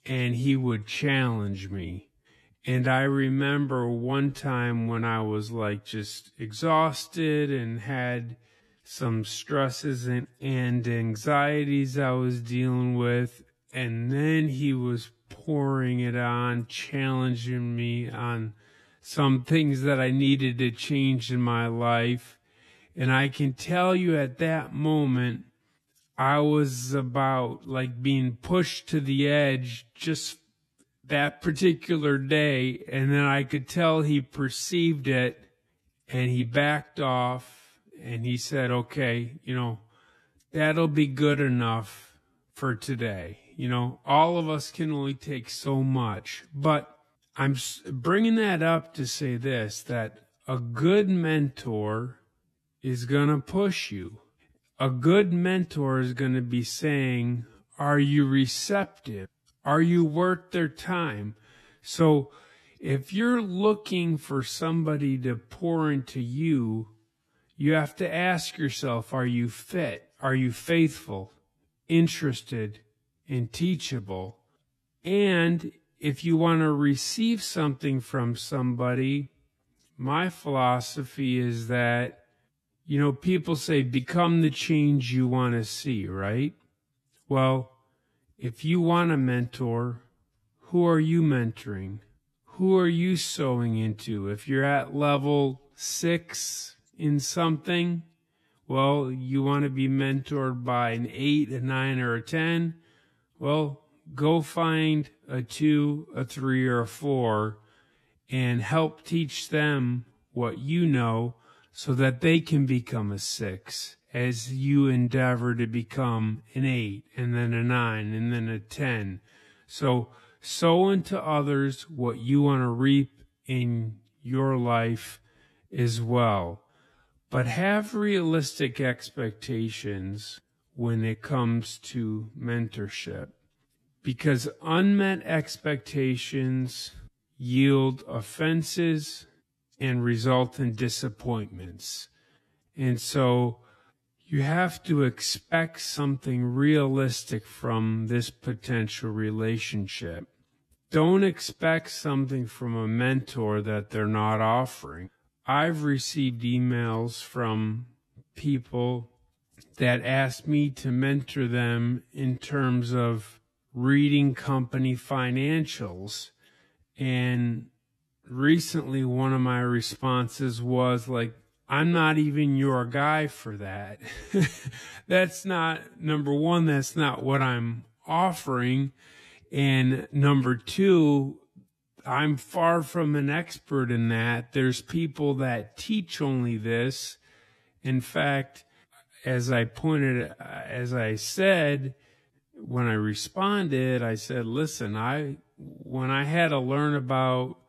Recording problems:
wrong speed, natural pitch; too slow; 0.6 times normal speed

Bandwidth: 13.5 kHz